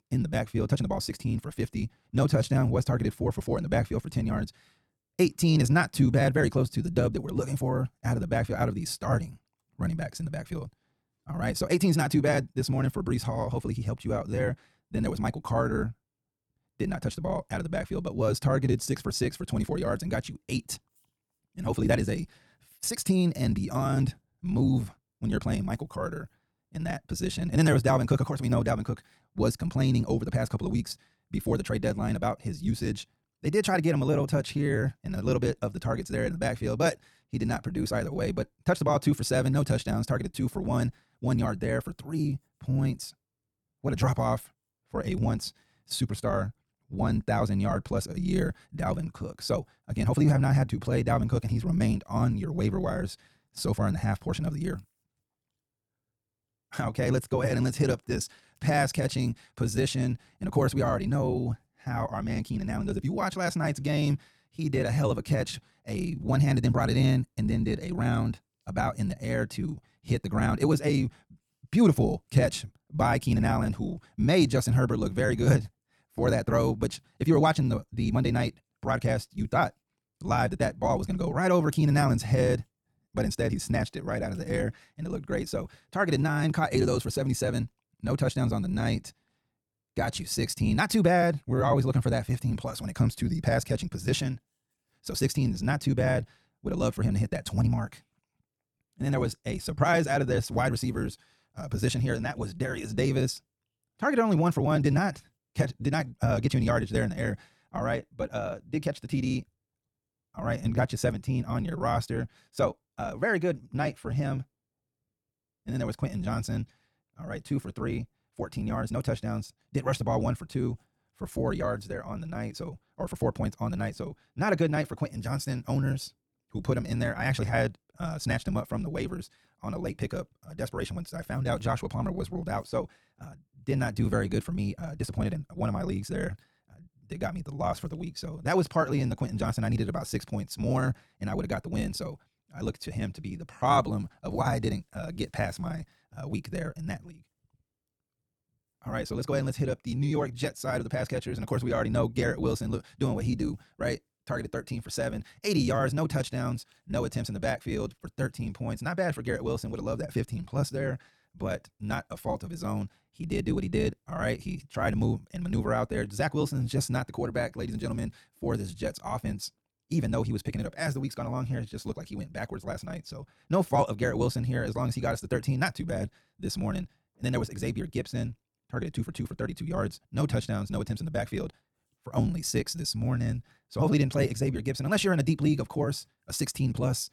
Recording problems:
wrong speed, natural pitch; too fast; 1.6 times normal speed

